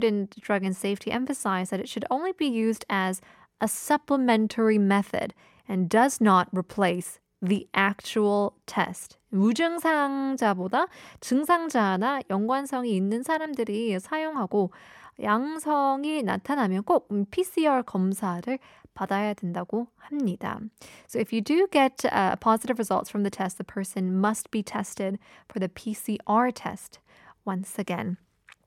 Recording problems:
abrupt cut into speech; at the start

